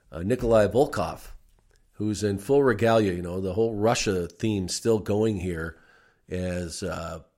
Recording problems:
none

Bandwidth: 16 kHz